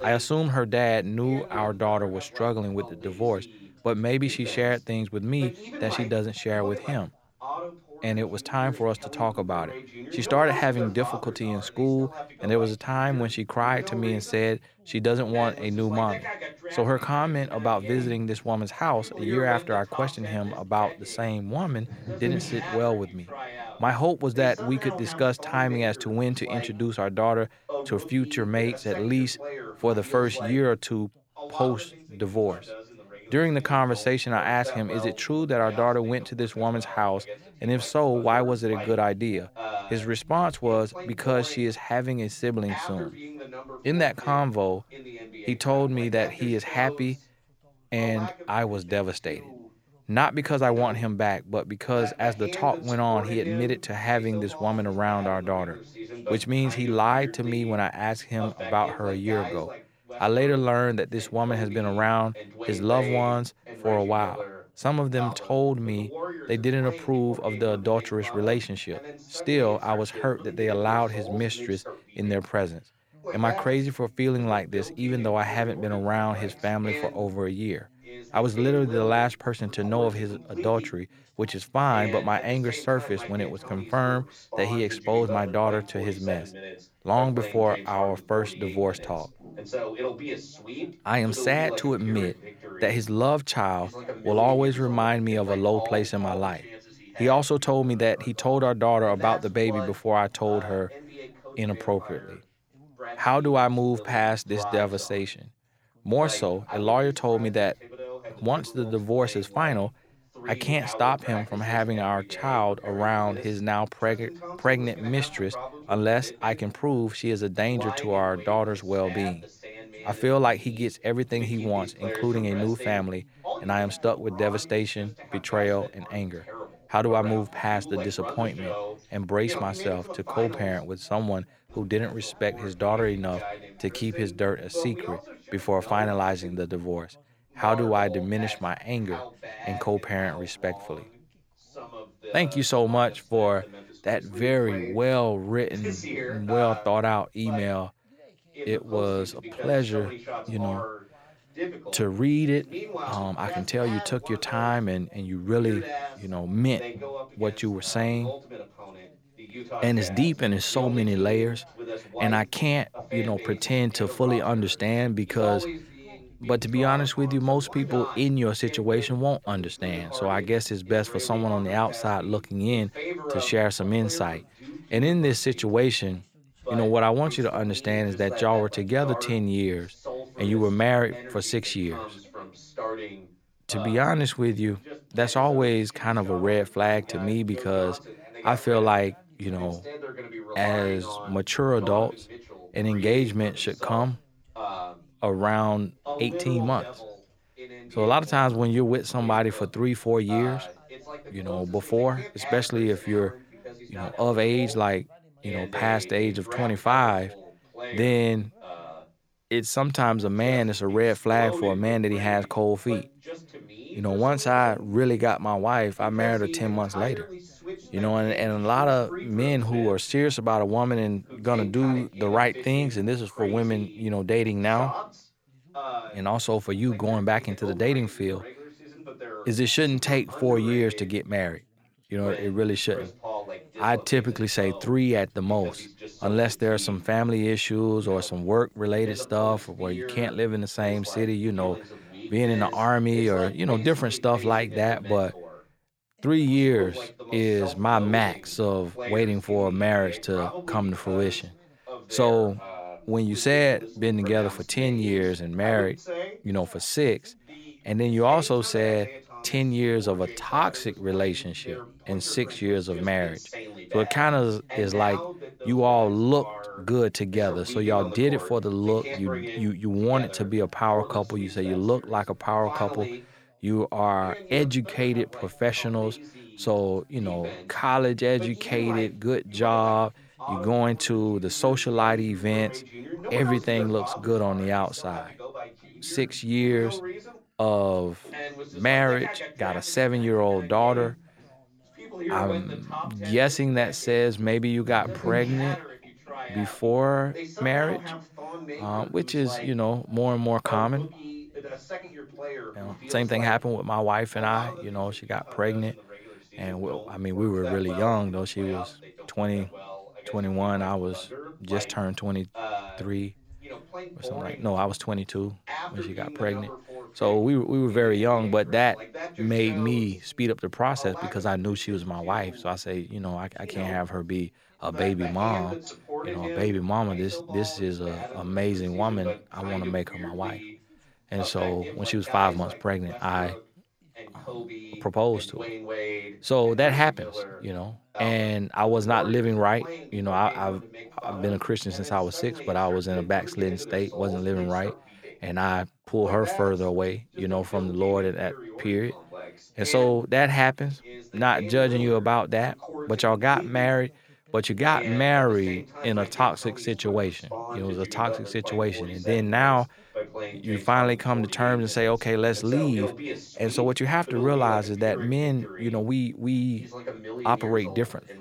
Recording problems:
background chatter; noticeable; throughout; 2 voices, 10 dB below the speech

